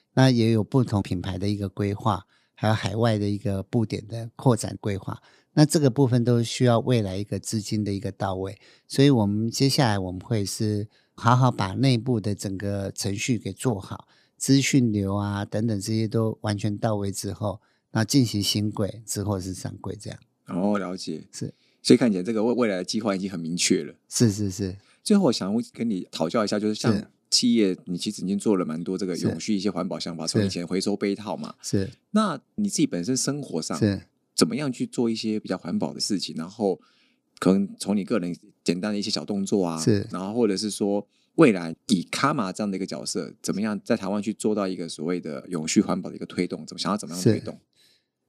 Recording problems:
none

